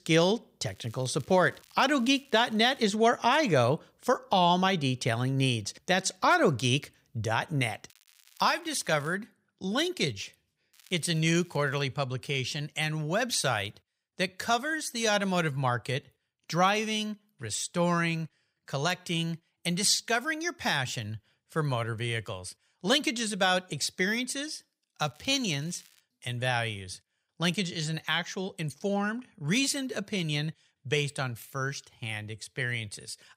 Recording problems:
crackling; faint; 4 times, first at 0.5 s; 30 dB below the speech

